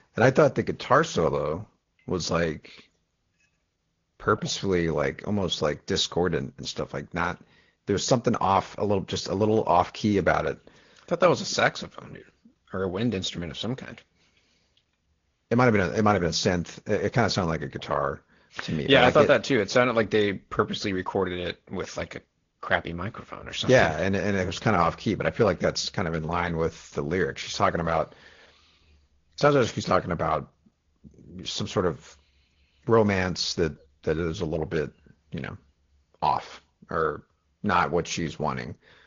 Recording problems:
high frequencies cut off; noticeable; nothing above 7 kHz
garbled, watery; slightly

